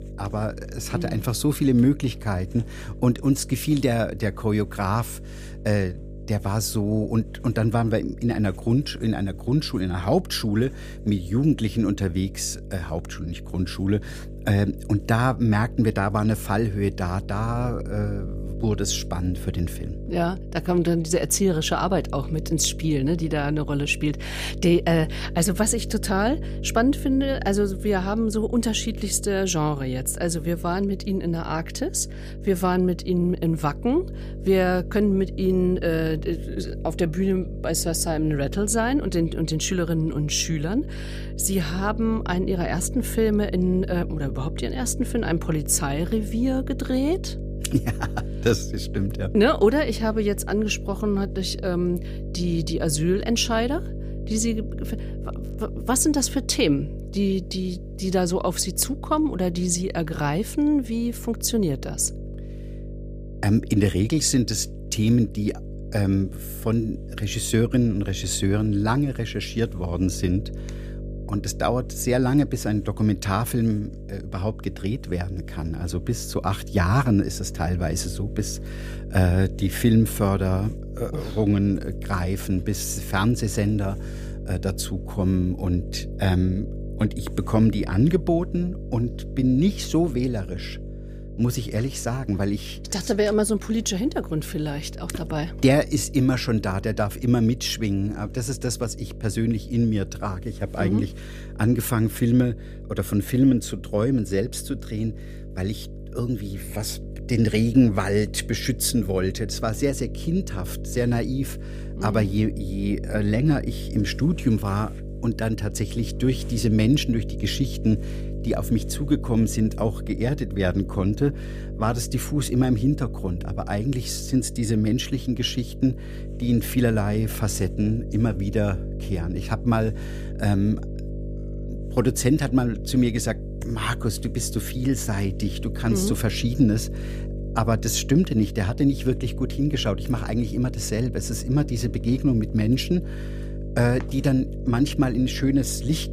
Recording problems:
electrical hum; noticeable; throughout; 50 Hz, 15 dB below the speech

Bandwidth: 15 kHz